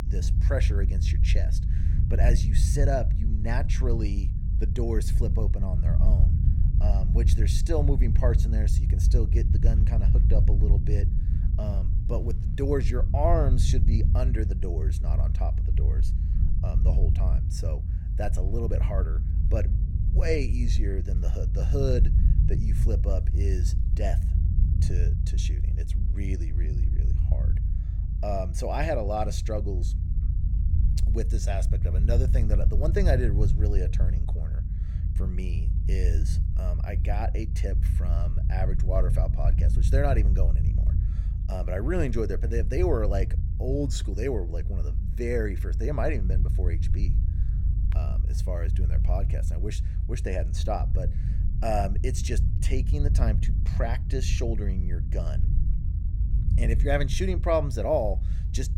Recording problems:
low rumble; loud; throughout; 9 dB below the speech

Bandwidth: 17.5 kHz